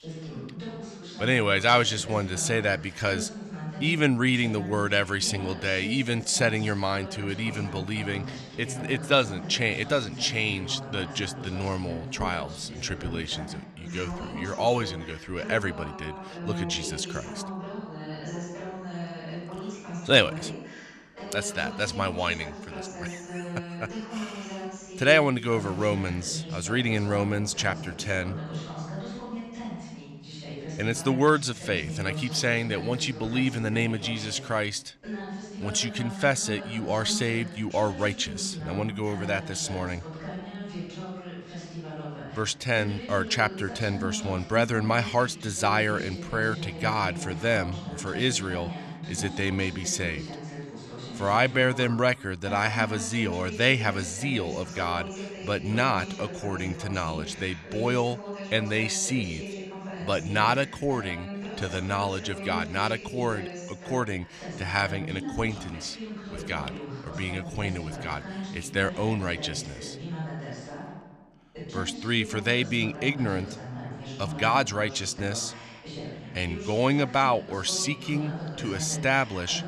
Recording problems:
voice in the background; noticeable; throughout; 10 dB below the speech

